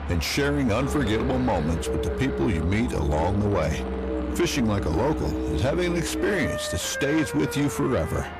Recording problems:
distortion; slight; 10 dB below the speech
background music; loud; throughout; 5 dB below the speech
train or aircraft noise; noticeable; throughout; 10 dB below the speech

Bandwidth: 14.5 kHz